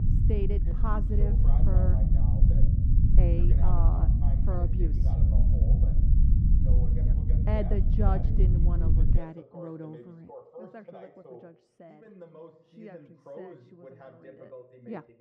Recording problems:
muffled; very; fading above 2.5 kHz
voice in the background; loud; throughout; 9 dB below the speech
low rumble; loud; until 9 s; 1 dB below the speech

